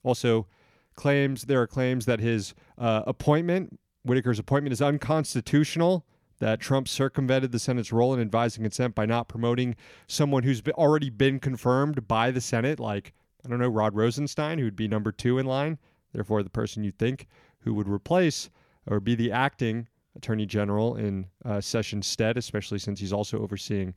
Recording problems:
none

